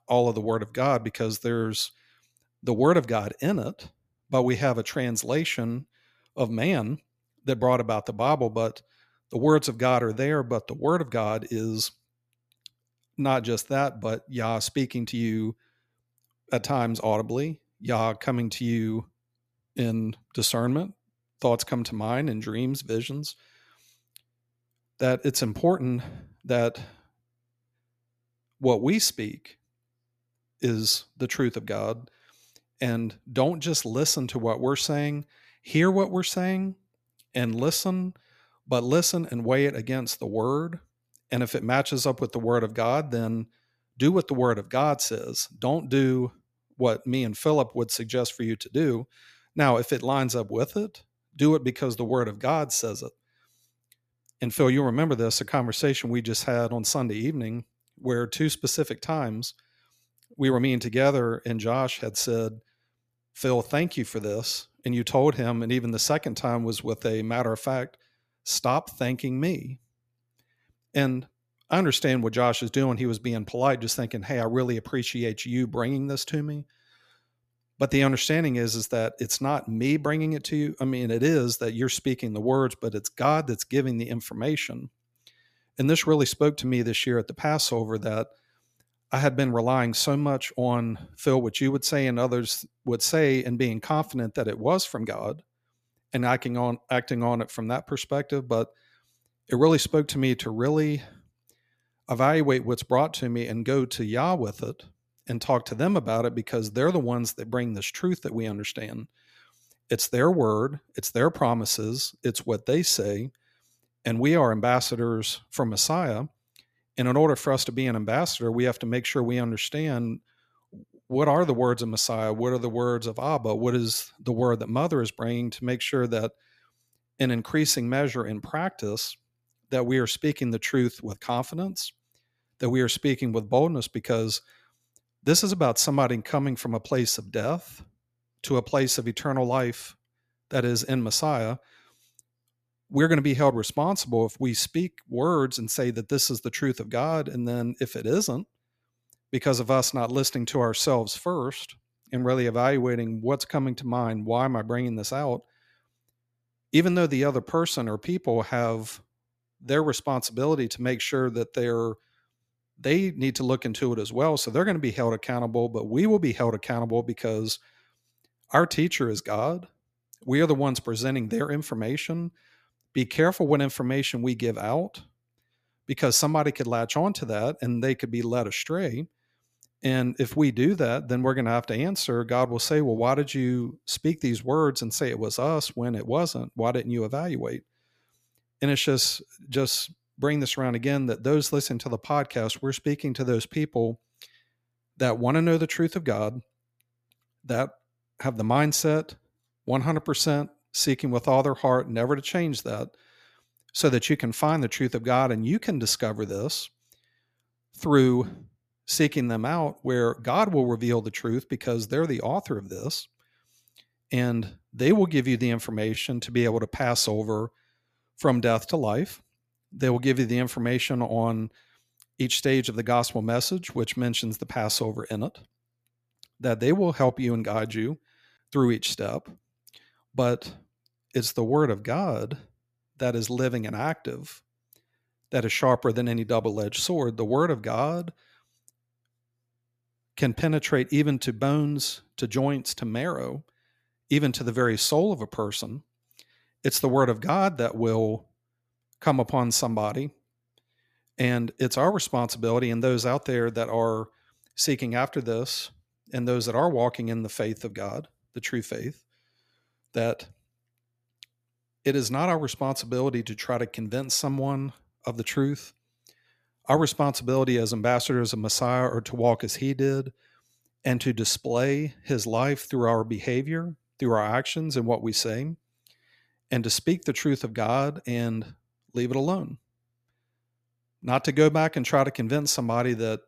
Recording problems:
uneven, jittery; slightly; from 15 s to 3:42

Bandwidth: 14.5 kHz